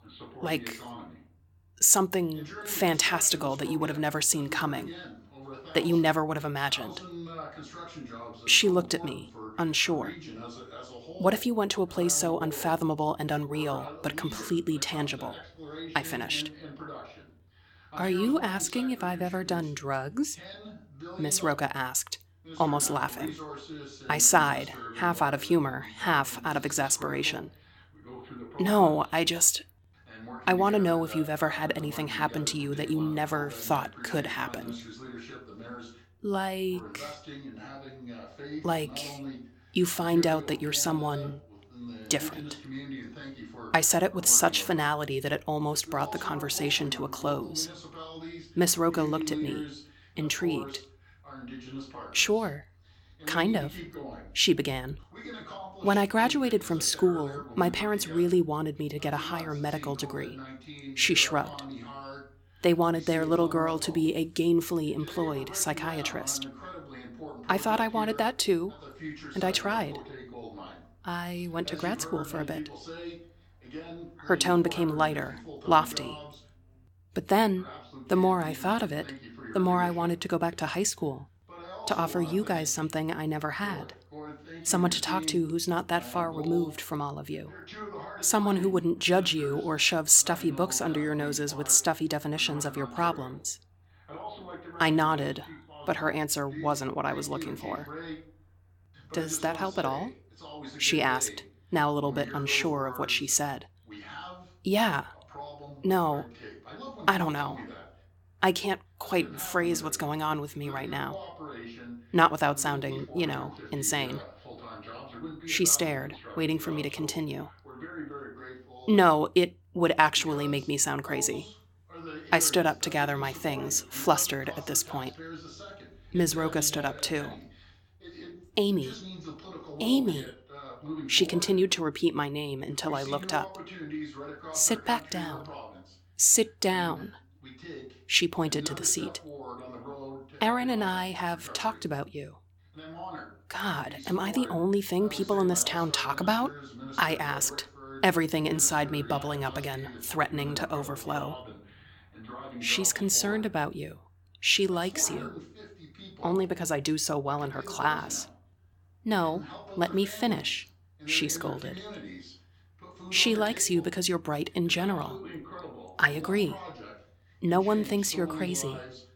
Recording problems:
voice in the background; noticeable; throughout; 15 dB below the speech

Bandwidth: 17 kHz